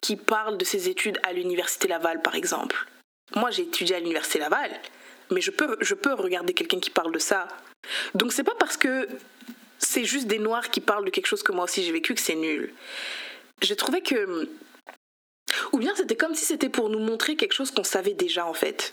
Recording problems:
squashed, flat; heavily
thin; very slightly; fading below 250 Hz

